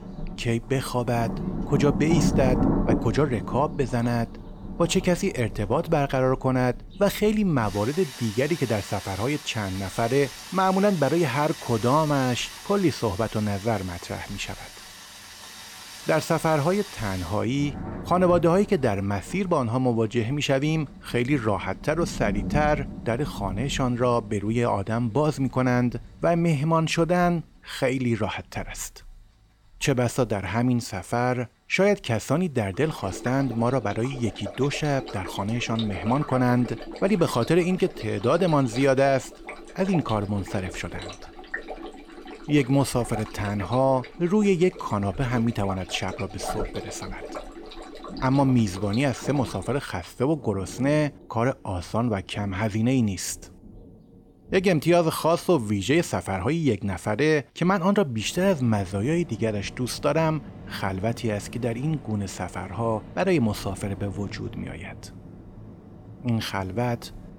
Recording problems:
rain or running water; noticeable; throughout; 10 dB below the speech

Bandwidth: 18 kHz